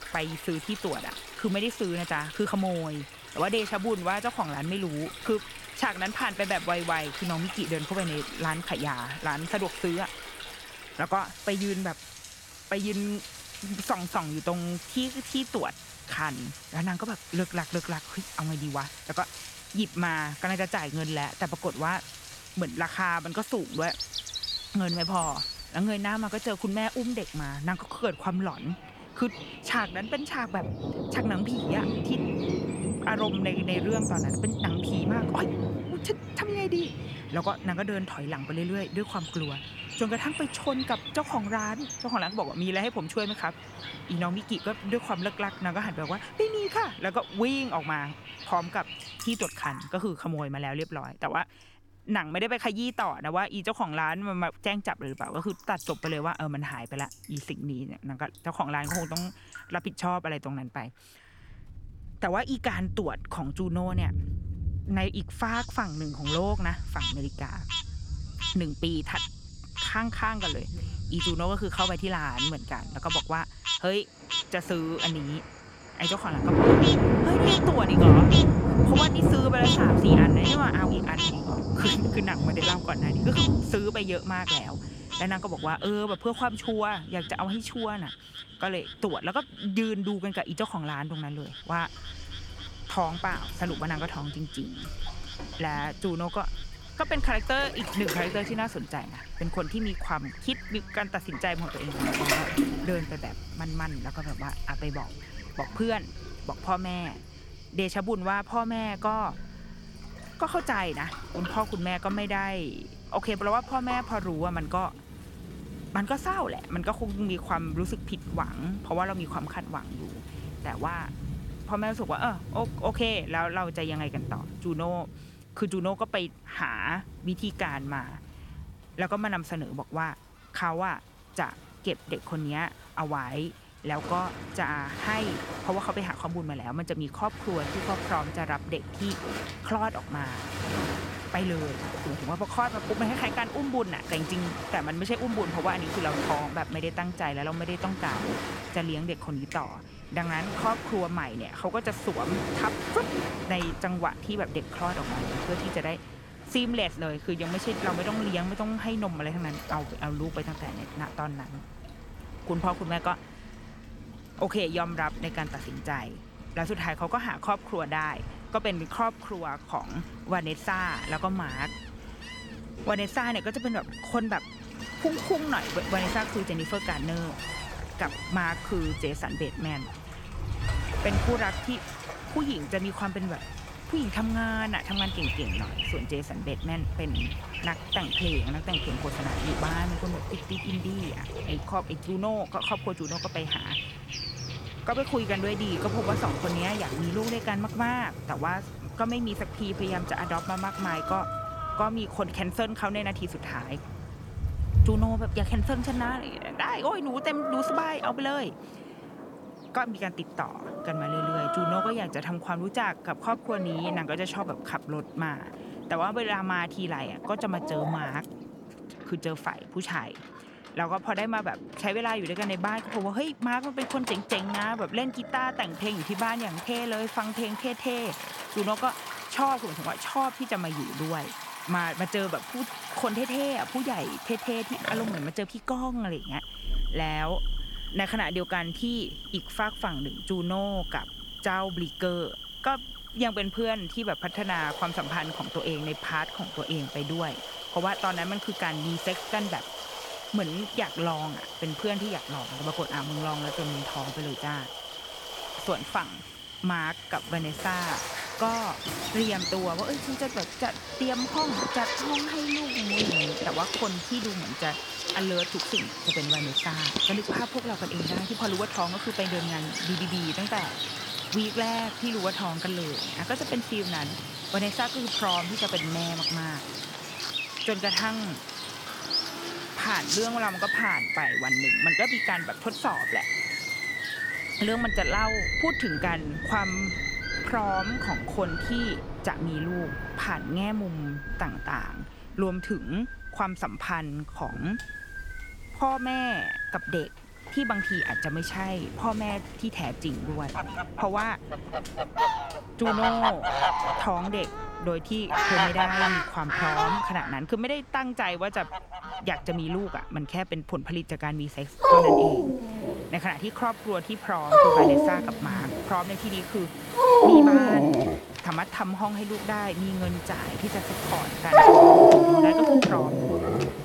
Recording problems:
animal sounds; very loud; throughout; 3 dB above the speech
rain or running water; loud; throughout; 3 dB below the speech

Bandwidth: 17.5 kHz